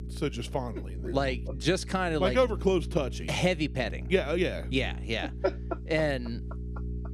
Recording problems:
electrical hum; faint; throughout; 60 Hz, 20 dB below the speech

